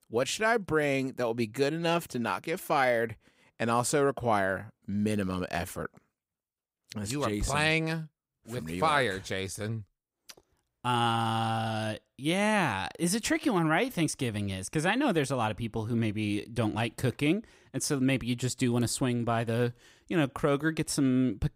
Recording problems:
none

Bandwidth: 15.5 kHz